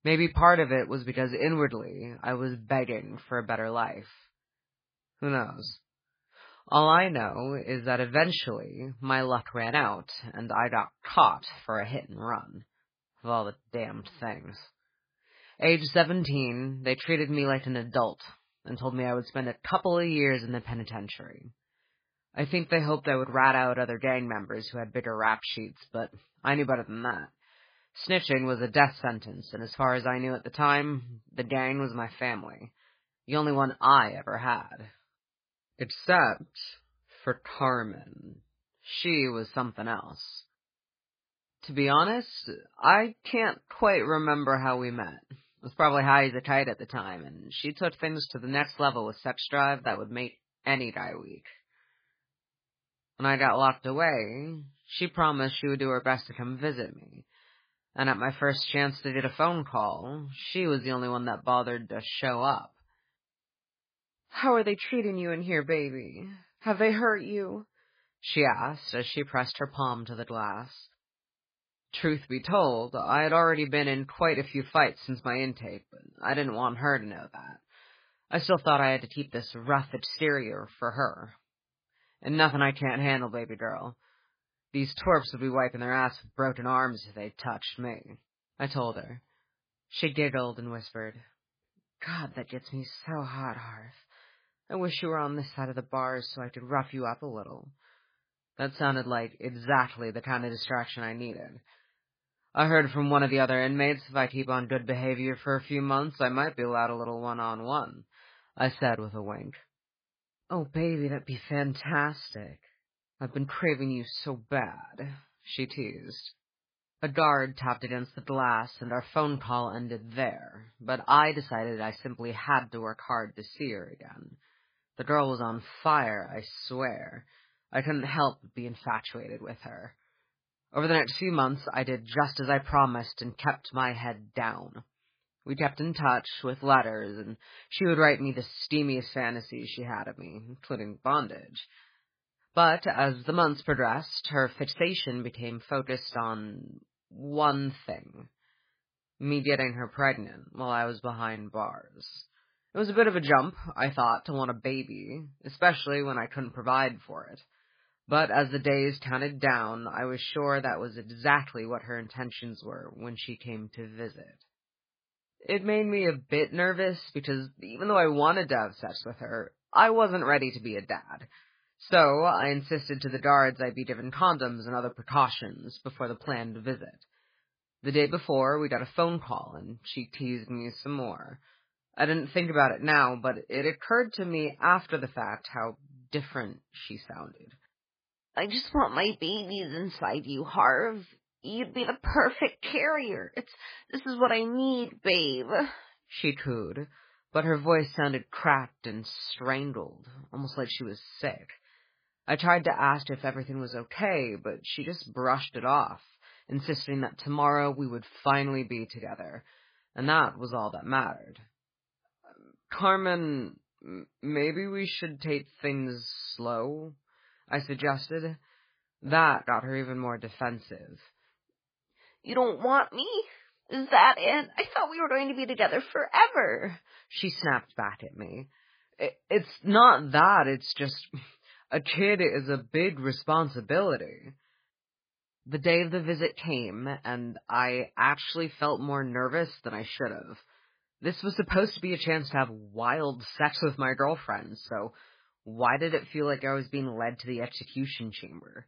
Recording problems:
garbled, watery; badly; nothing above 5 kHz

